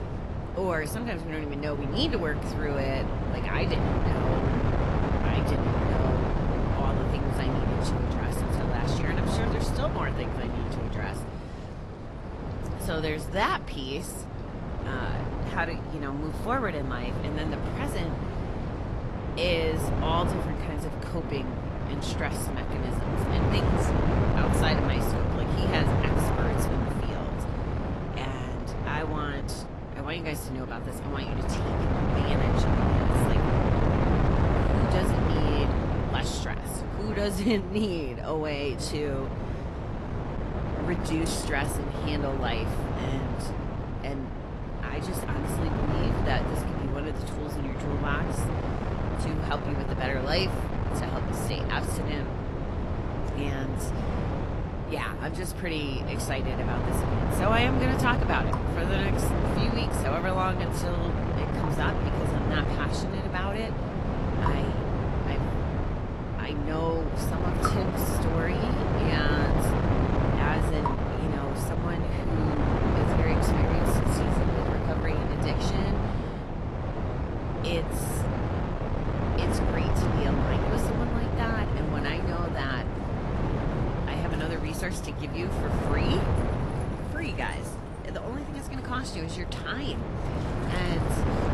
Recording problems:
garbled, watery; slightly; nothing above 12.5 kHz
wind noise on the microphone; heavy; as loud as the speech
rain or running water; noticeable; throughout; 15 dB below the speech

